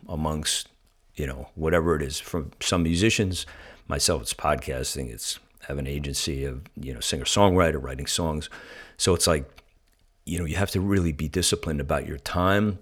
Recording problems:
none

